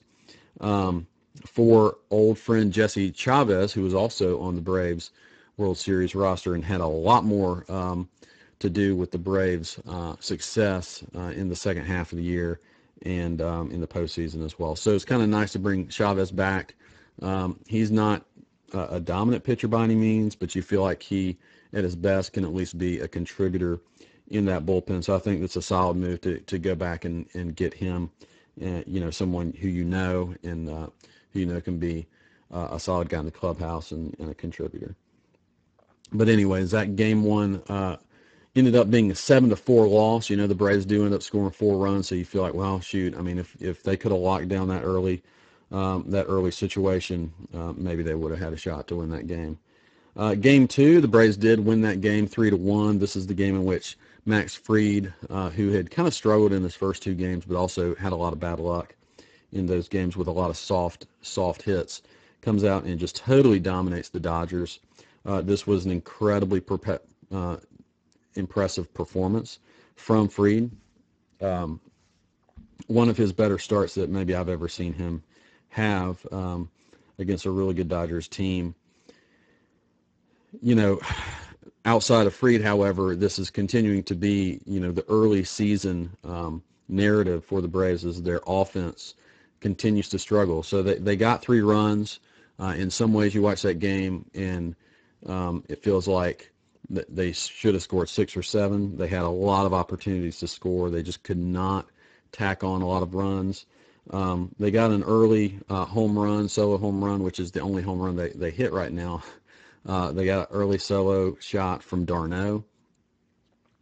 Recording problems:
garbled, watery; badly; nothing above 7.5 kHz

